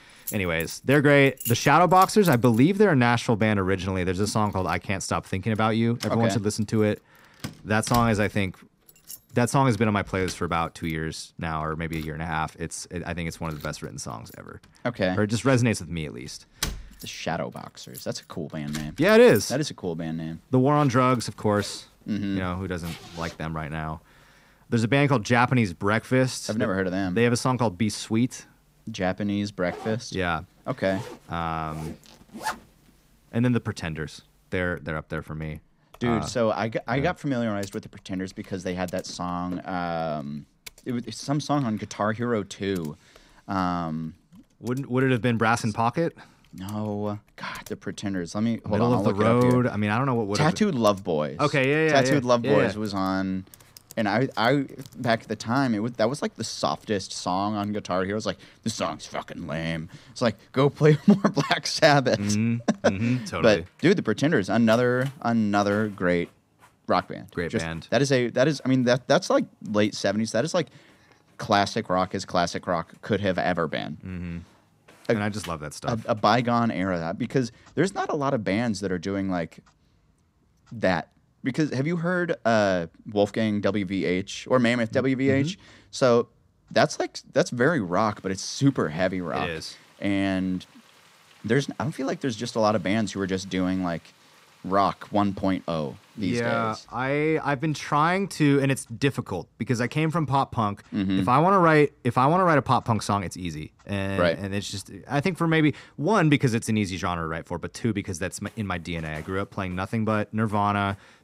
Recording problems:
household noises; noticeable; throughout; 20 dB below the speech

